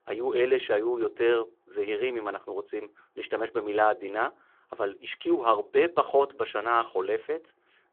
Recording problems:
phone-call audio

